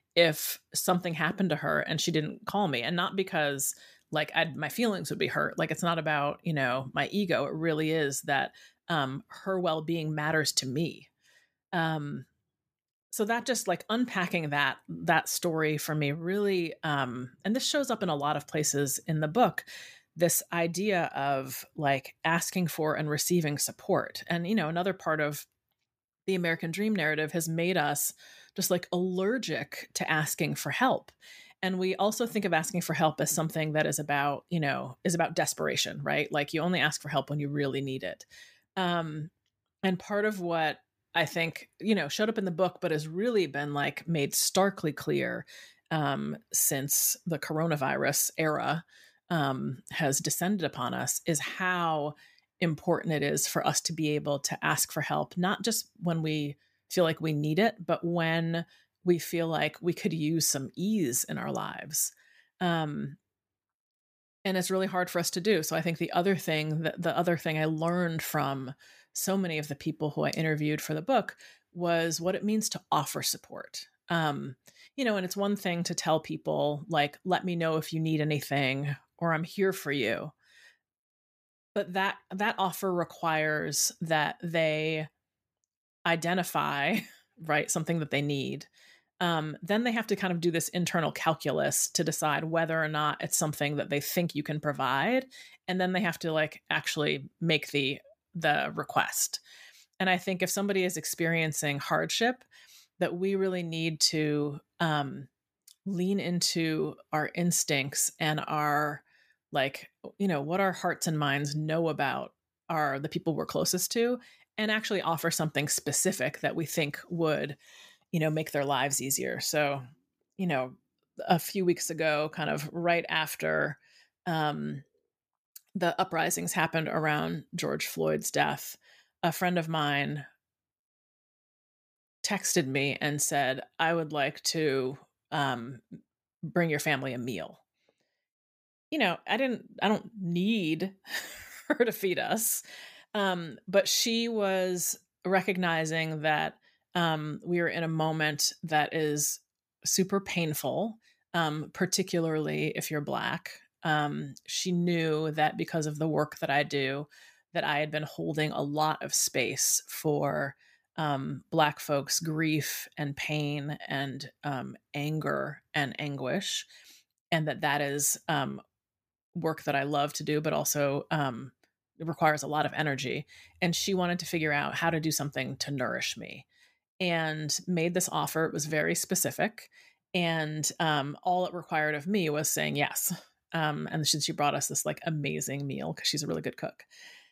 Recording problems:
none

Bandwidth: 15 kHz